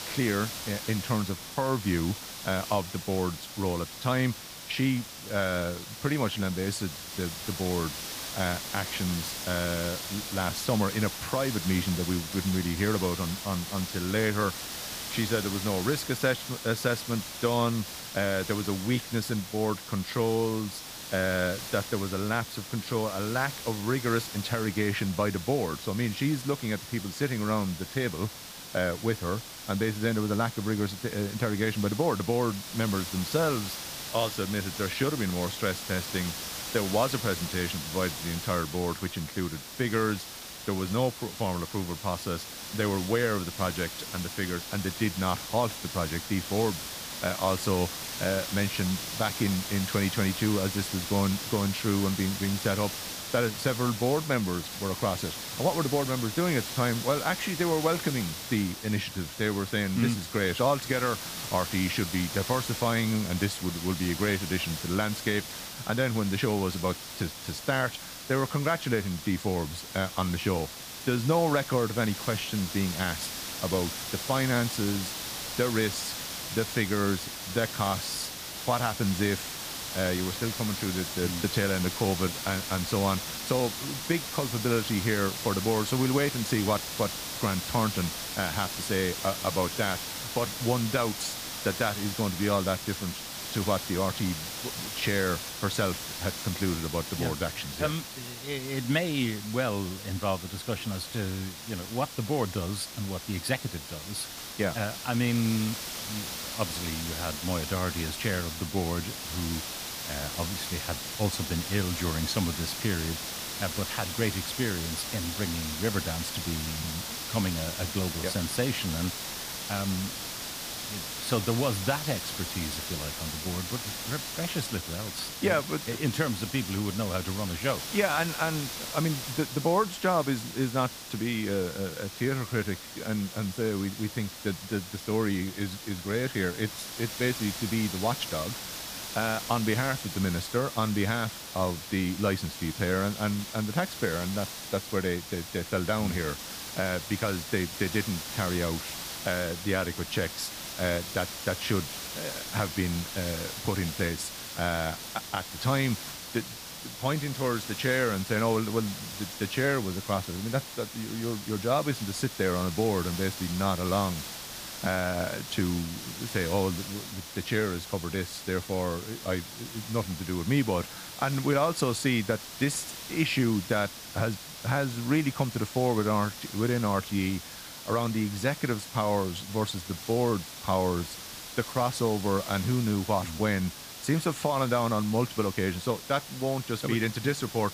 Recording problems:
hiss; loud; throughout; 6 dB below the speech

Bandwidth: 15 kHz